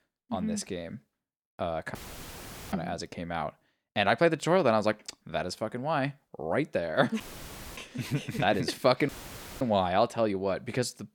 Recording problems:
audio cutting out; filled with static; at 2 s for 1 s, at 7 s for 0.5 s and at 9 s for 0.5 s

